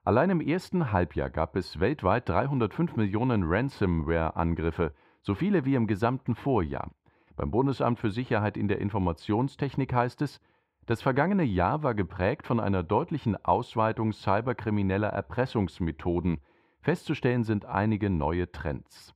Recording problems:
muffled; very; fading above 4 kHz

